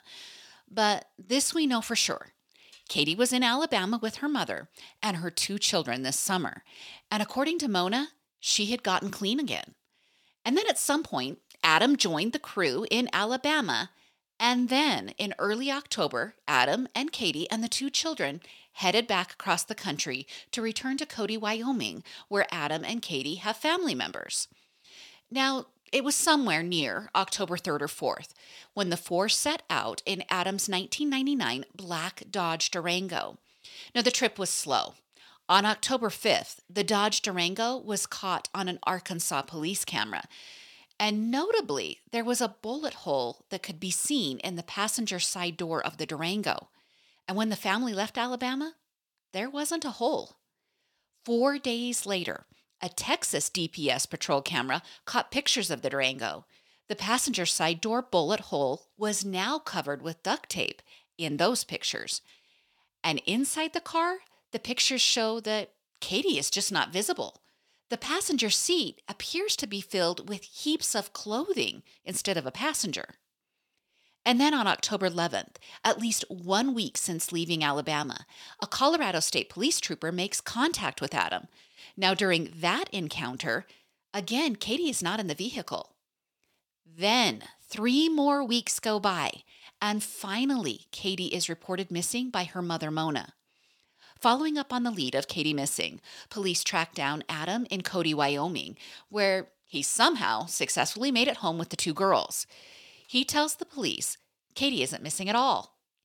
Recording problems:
thin; very slightly; fading below 500 Hz

